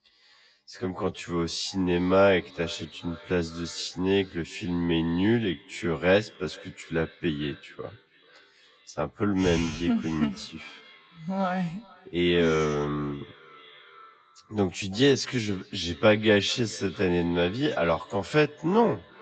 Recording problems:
wrong speed, natural pitch; too slow; 0.6 times normal speed
echo of what is said; faint; throughout; 440 ms later, 25 dB below the speech
garbled, watery; slightly; nothing above 7.5 kHz
high frequencies cut off; slight

